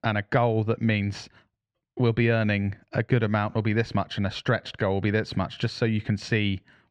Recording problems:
muffled; slightly; fading above 3 kHz

